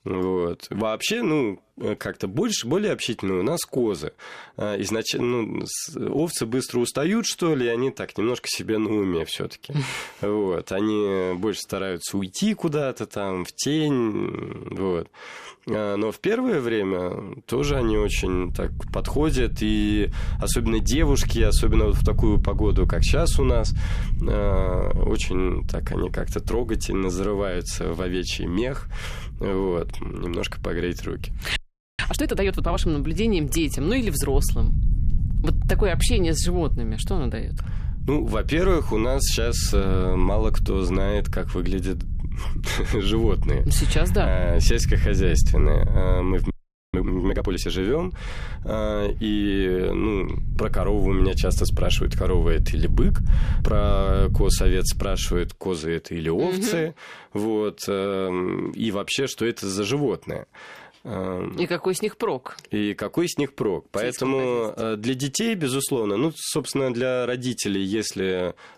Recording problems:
low rumble; noticeable; from 18 to 55 s; 15 dB below the speech
audio freezing; at 32 s and at 47 s

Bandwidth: 14.5 kHz